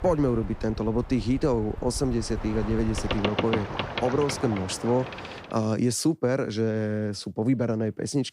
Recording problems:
train or aircraft noise; loud; until 5.5 s; 7 dB below the speech

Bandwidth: 15.5 kHz